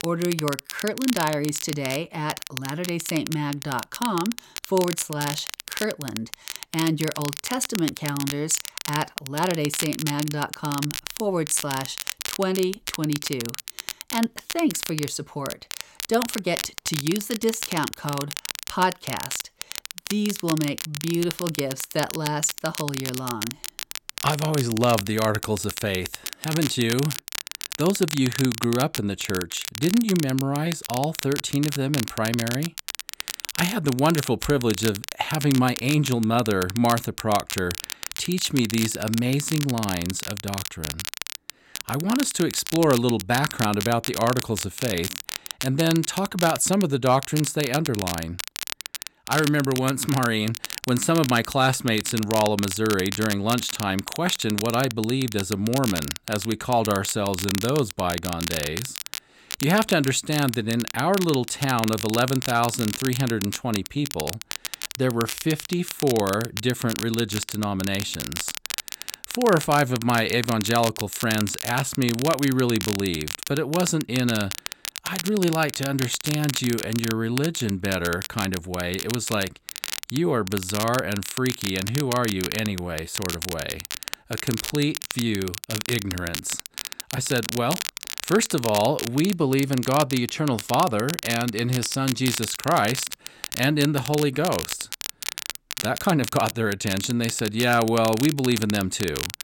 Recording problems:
crackle, like an old record; loud; 7 dB below the speech

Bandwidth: 16.5 kHz